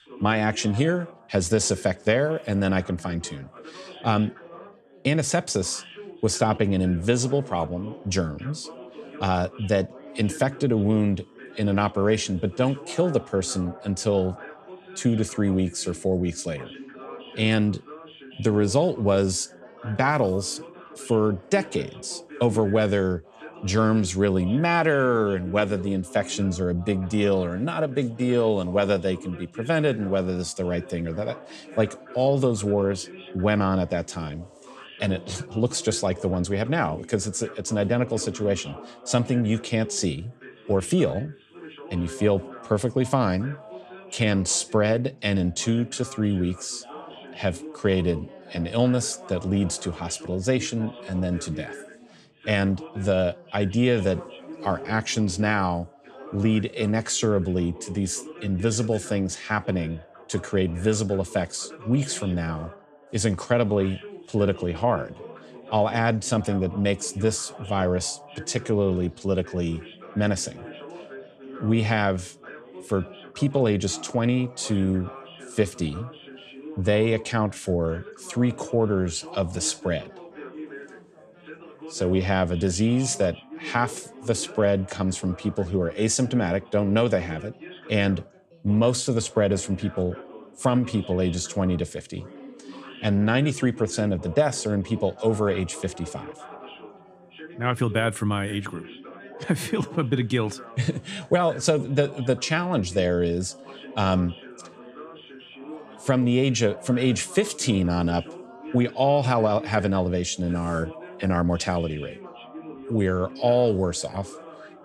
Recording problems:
background chatter; noticeable; throughout; 3 voices, 20 dB below the speech

